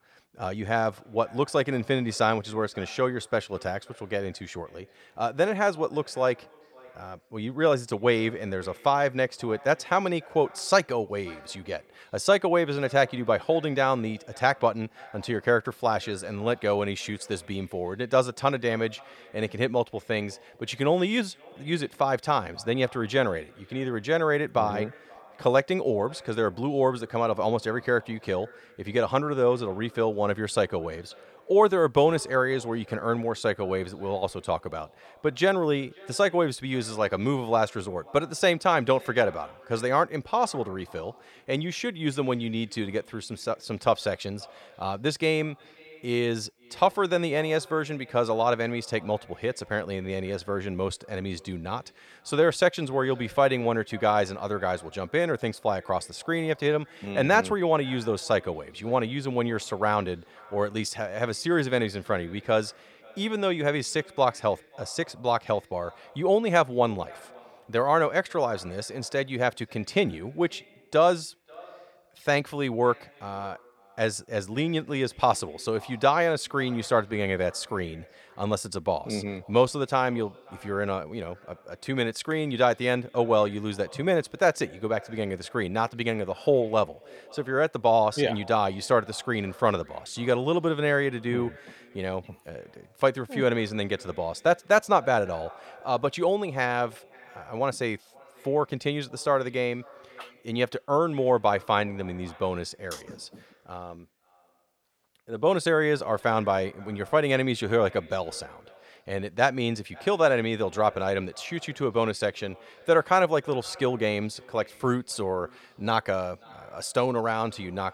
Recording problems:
echo of what is said; faint; throughout; 530 ms later, 25 dB below the speech

